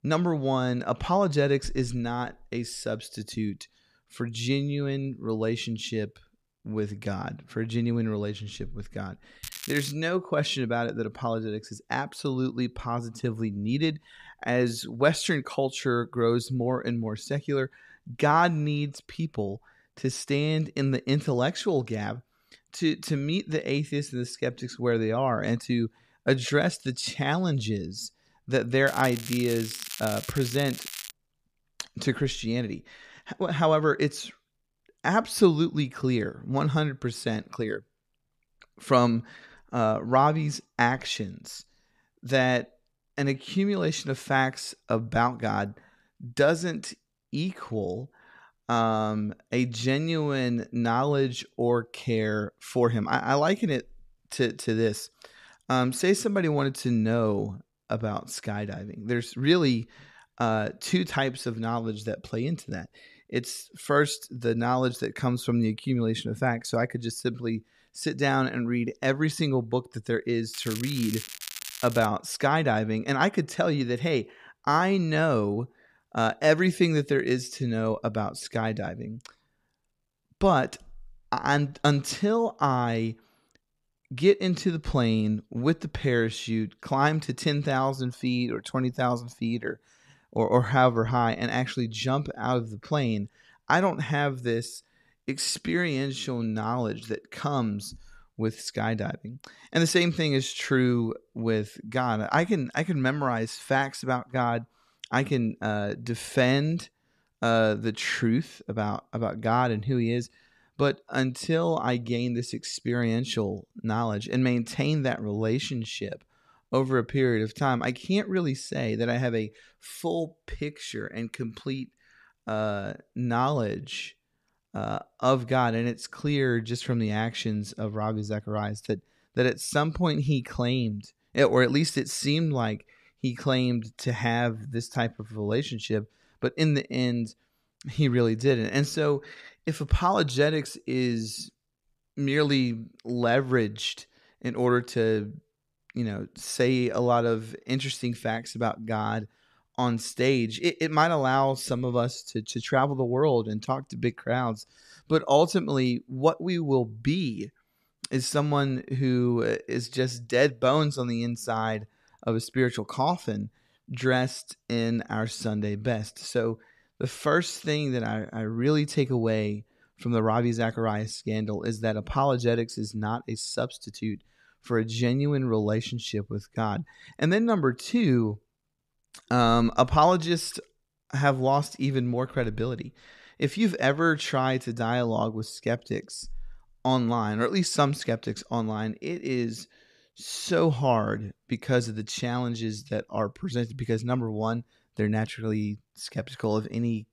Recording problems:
crackling; noticeable; at 9.5 s, from 29 to 31 s and from 1:11 to 1:12; 10 dB below the speech

